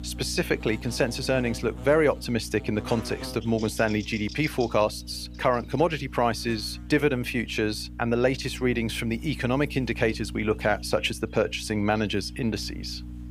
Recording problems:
electrical hum; noticeable; throughout; 60 Hz, 20 dB below the speech

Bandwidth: 15 kHz